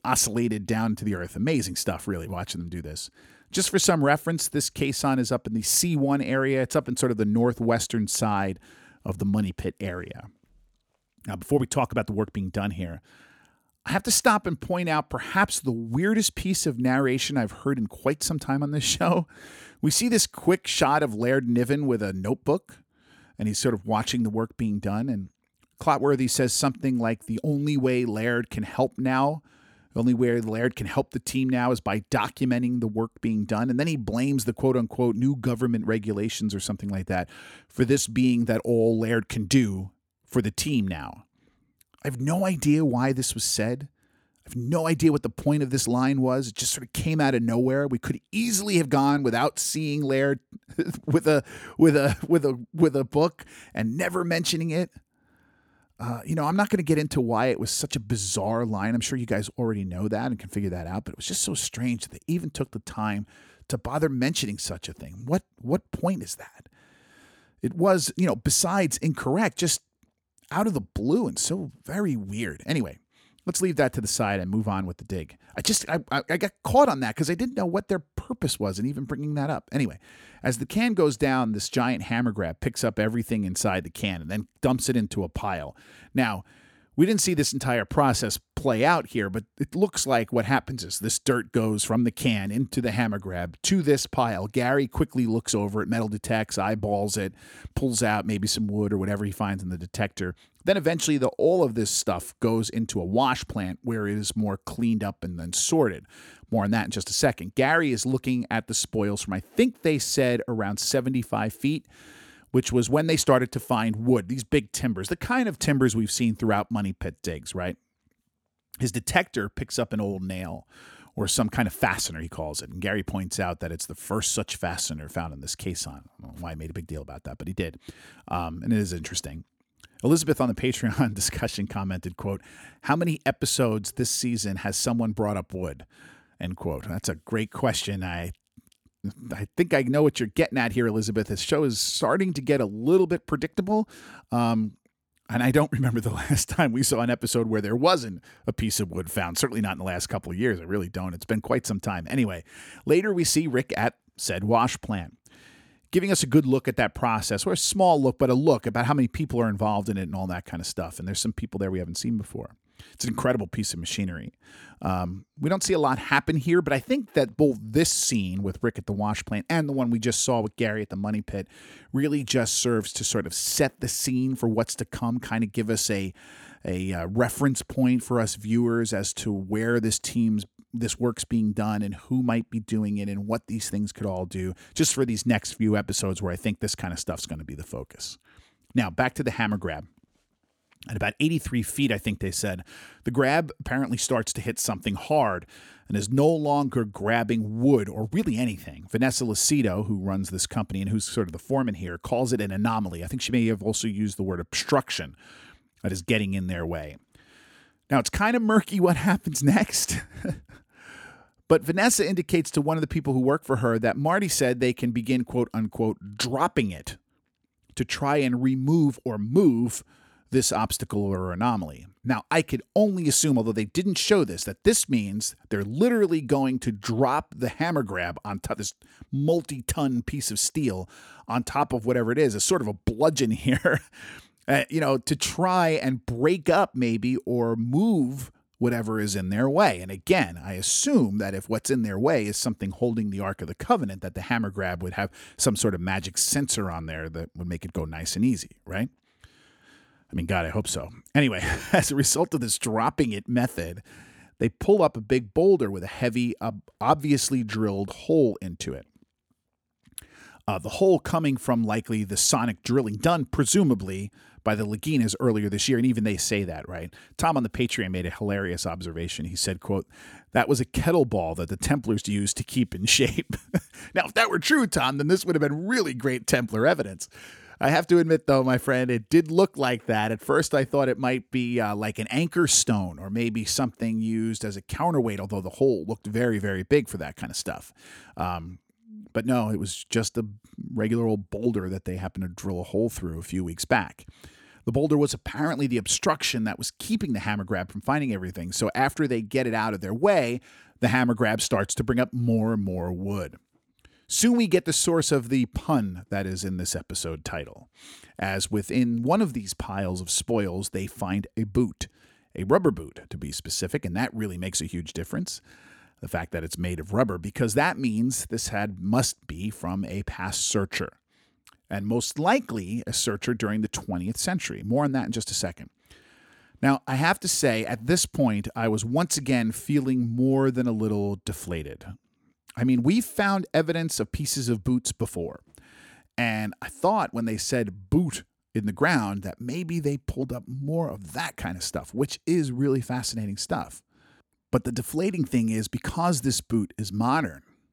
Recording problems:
none

